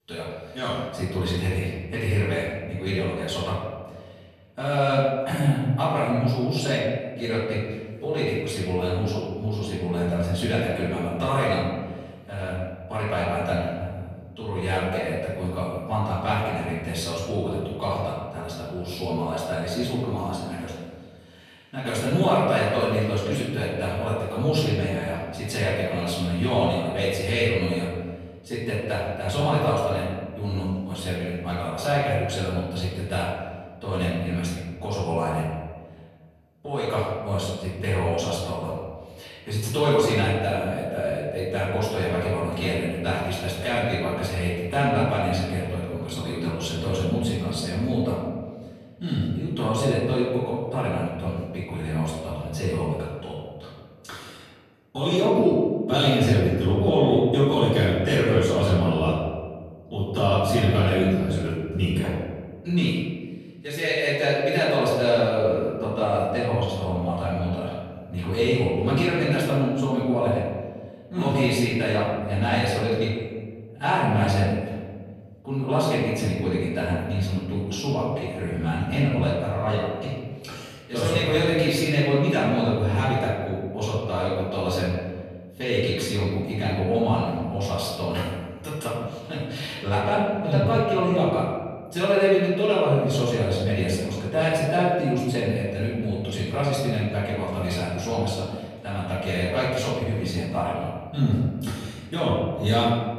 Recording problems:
room echo; strong; dies away in 1.5 s
off-mic speech; far

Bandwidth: 14 kHz